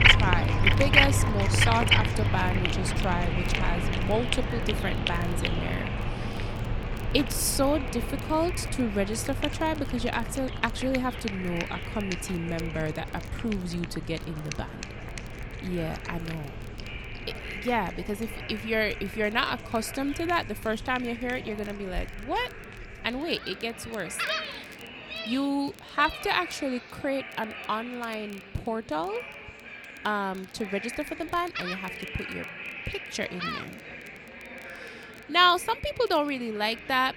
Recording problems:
animal sounds; very loud; throughout; as loud as the speech
background chatter; noticeable; throughout; 3 voices, 10 dB below the speech
crackle, like an old record; faint; 25 dB below the speech

